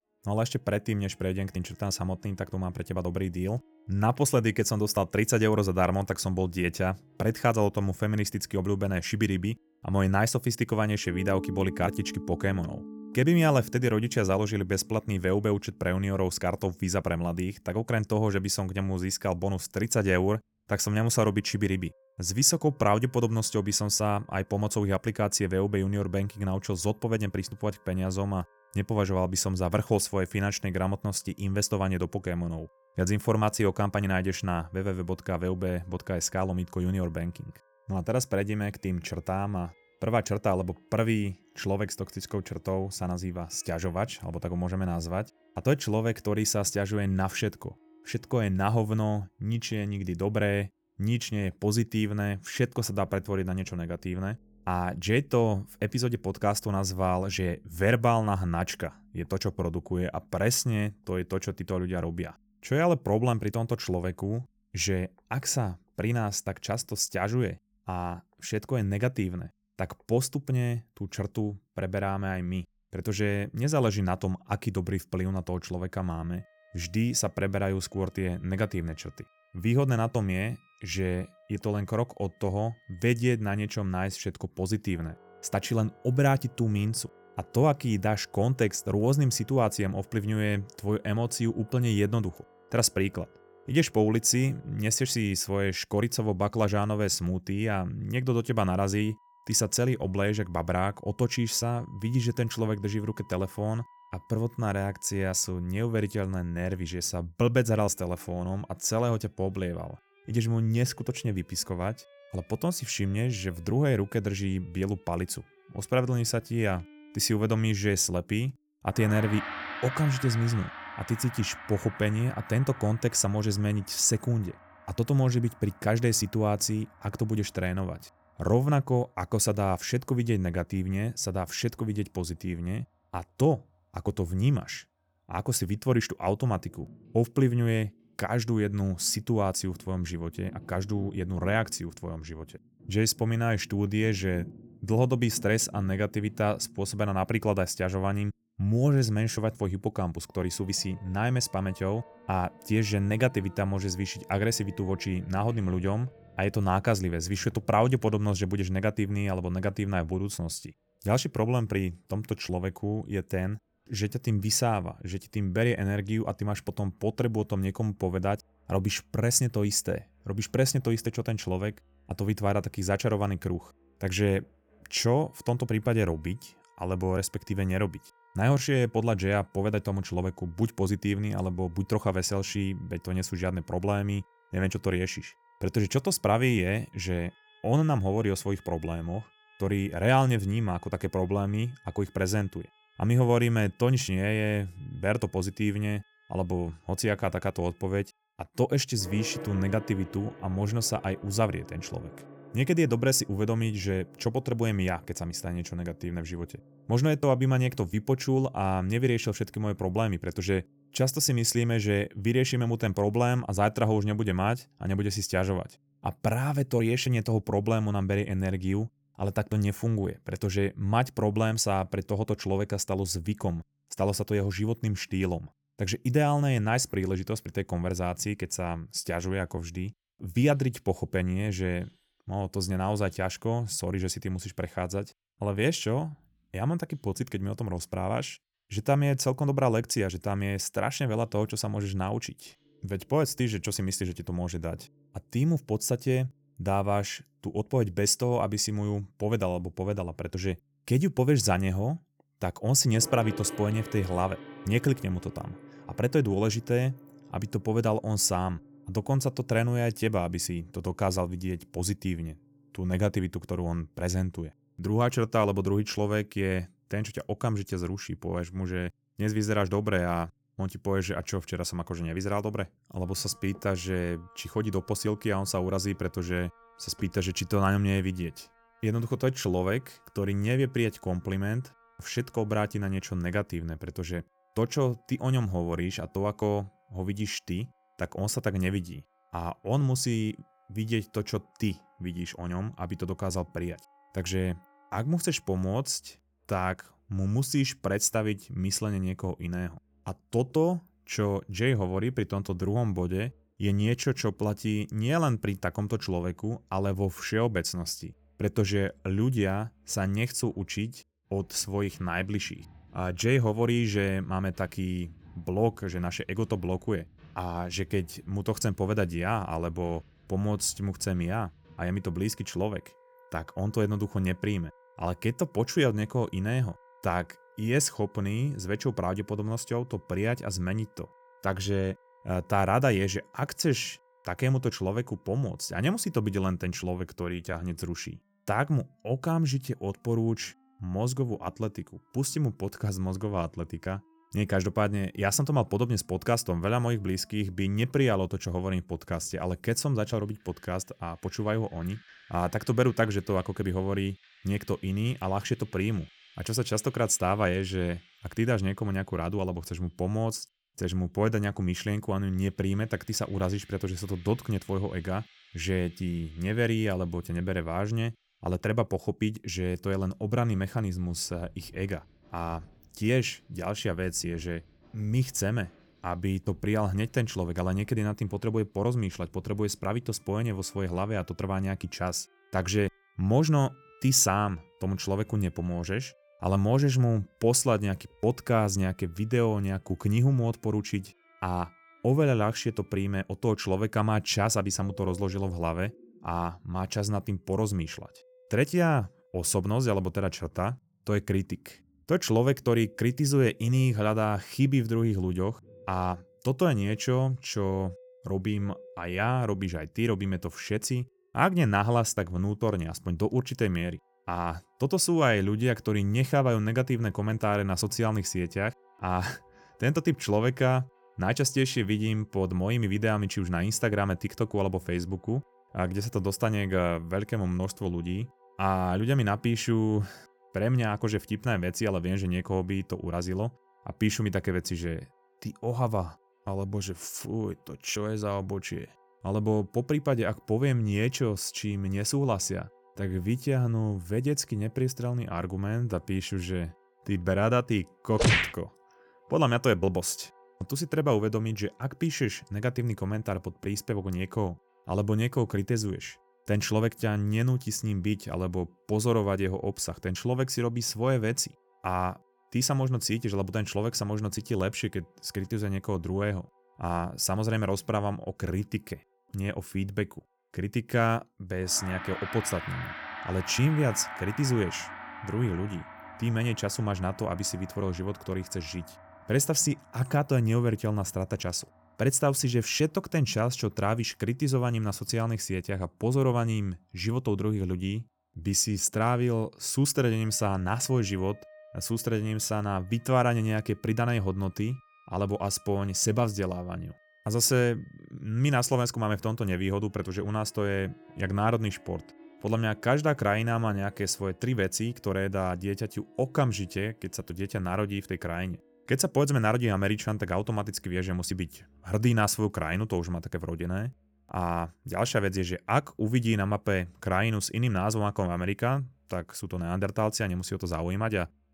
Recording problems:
background music; faint; throughout; 20 dB below the speech

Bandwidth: 18.5 kHz